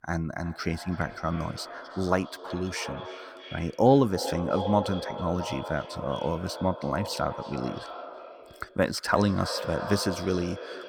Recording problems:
echo of what is said; strong; throughout; 320 ms later, 9 dB below the speech

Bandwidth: 19 kHz